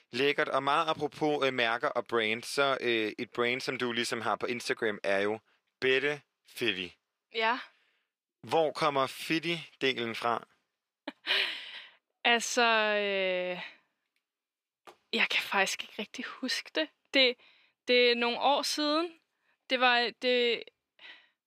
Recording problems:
thin; somewhat; fading below 400 Hz

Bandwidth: 15 kHz